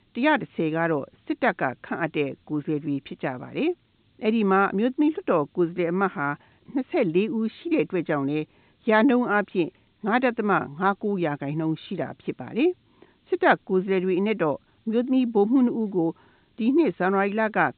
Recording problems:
high frequencies cut off; severe; nothing above 4 kHz
hiss; very faint; throughout; 45 dB below the speech

